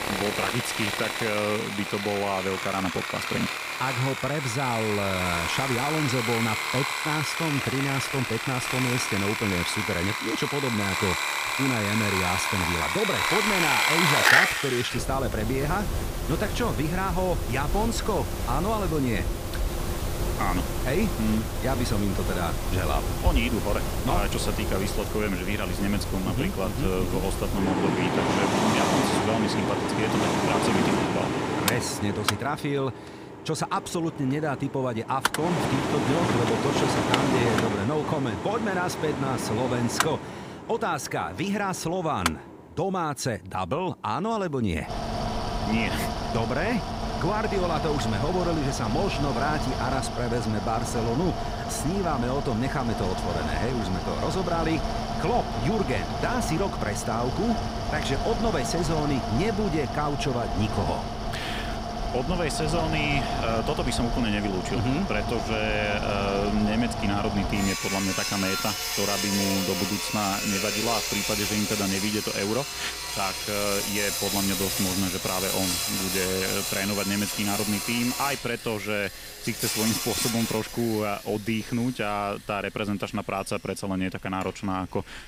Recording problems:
machinery noise; very loud; throughout; as loud as the speech

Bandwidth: 15.5 kHz